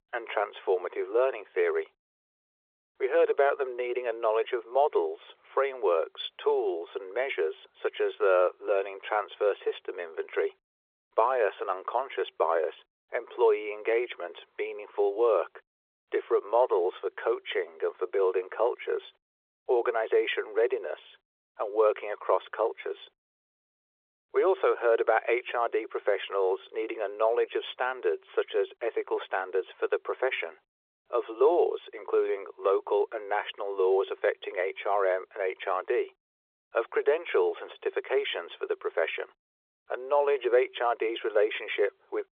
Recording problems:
phone-call audio; nothing above 3.5 kHz

